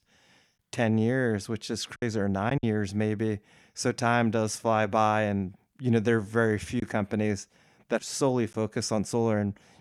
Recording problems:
choppy; occasionally; at 2 s; 2% of the speech affected

